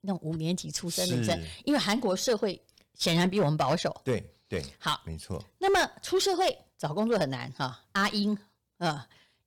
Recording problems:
distortion; slight; 4% of the sound clipped

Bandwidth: 18.5 kHz